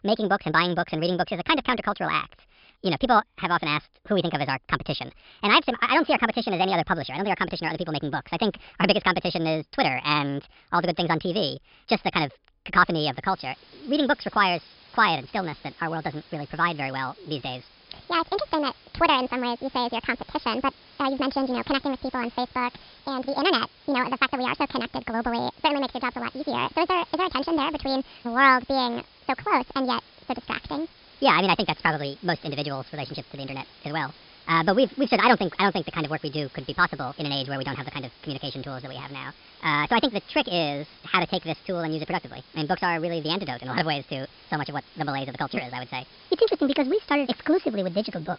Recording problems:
wrong speed and pitch; too fast and too high; 1.6 times normal speed
high frequencies cut off; noticeable; nothing above 5.5 kHz
hiss; faint; from 13 s on; 25 dB below the speech

